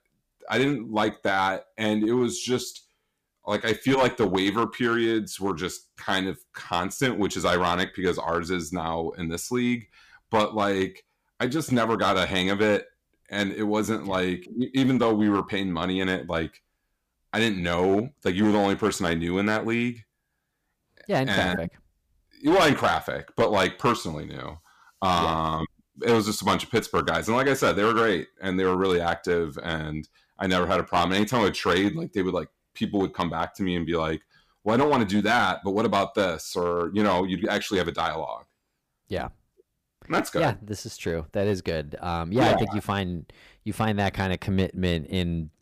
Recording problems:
distortion; slight; 4% of the sound clipped

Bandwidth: 15 kHz